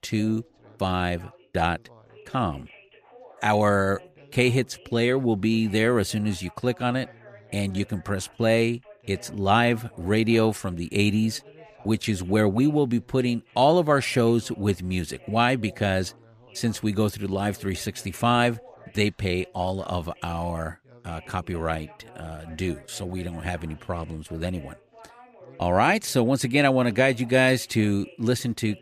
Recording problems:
background chatter; faint; throughout; 2 voices, 25 dB below the speech

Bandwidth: 14.5 kHz